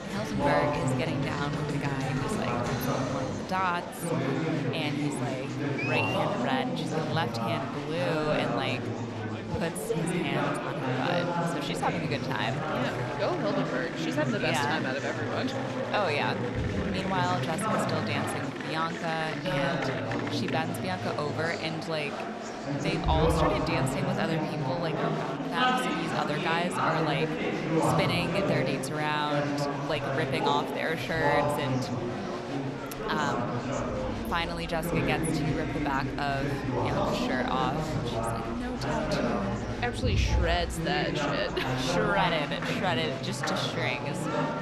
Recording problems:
murmuring crowd; very loud; throughout; 2 dB above the speech

